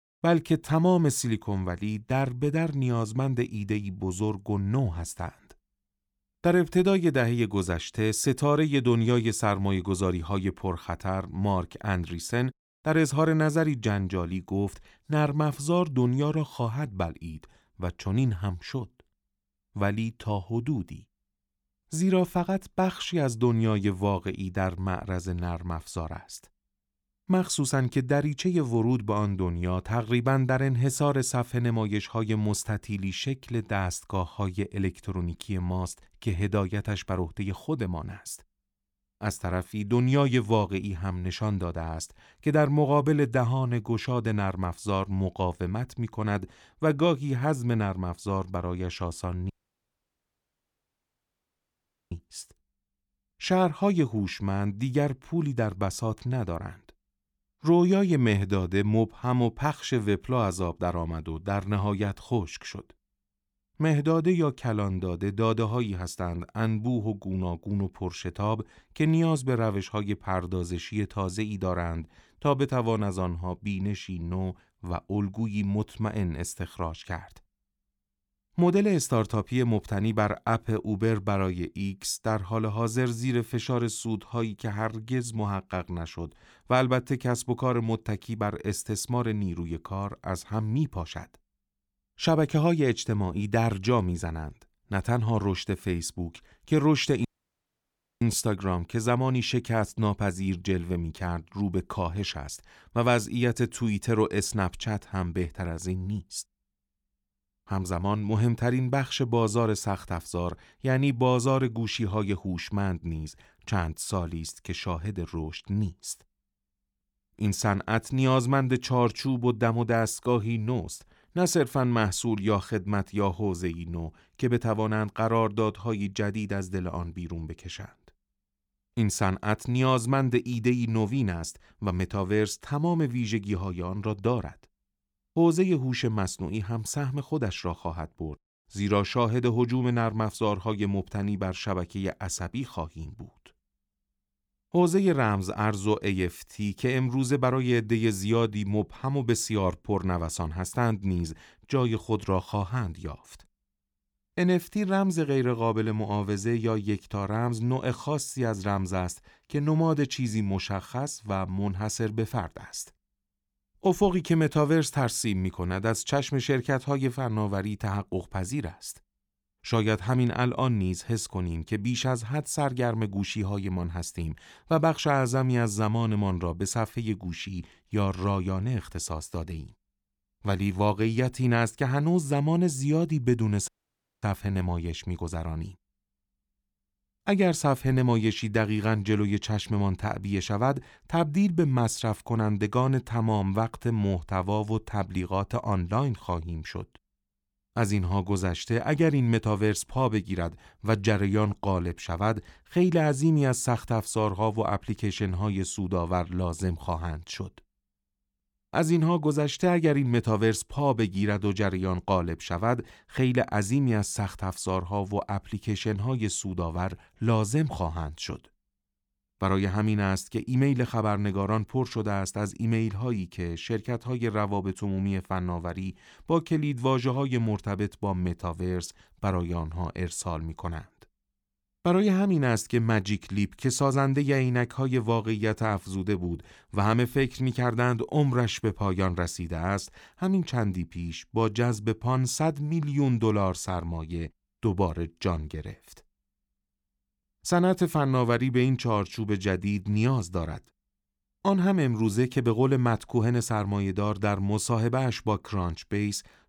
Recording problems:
audio cutting out; at 50 s for 2.5 s, at 1:37 for 1 s and at 3:04 for 0.5 s

